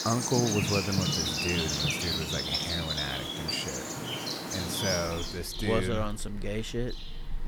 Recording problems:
animal sounds; very loud; throughout; 3 dB above the speech

